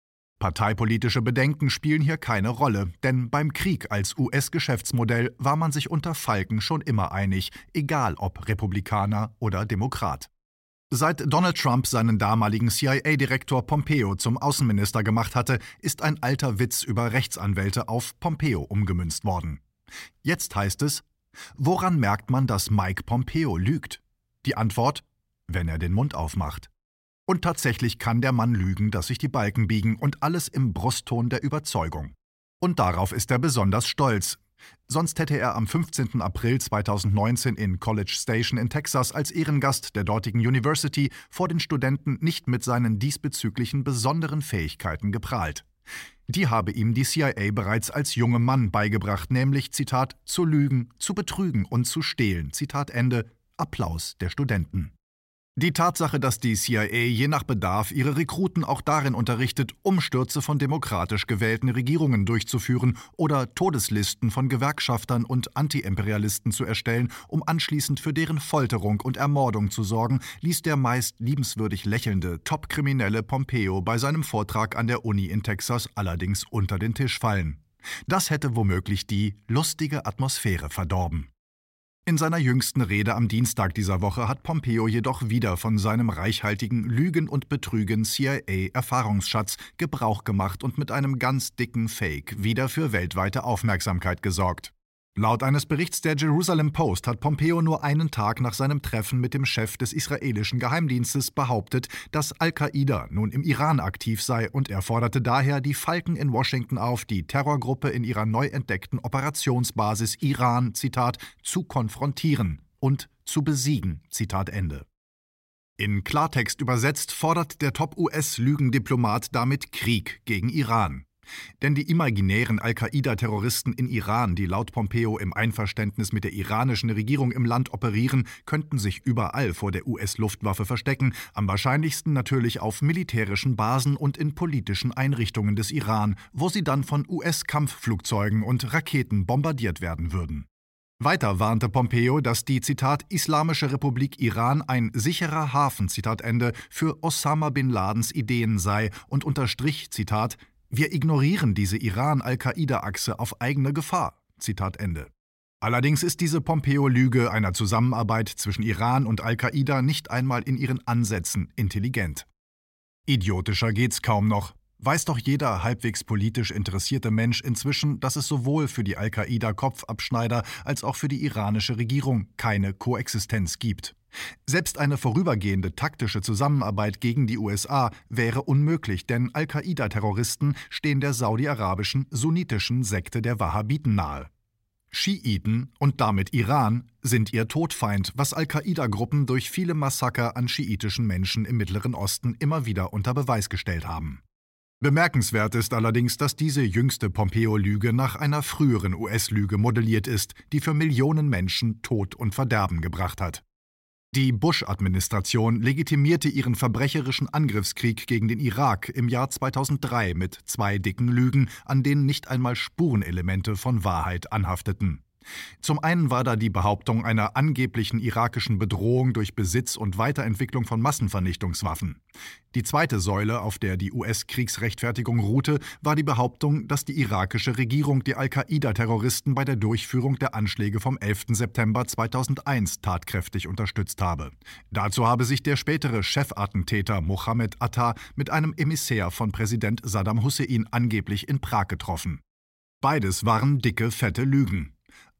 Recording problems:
none

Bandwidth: 16 kHz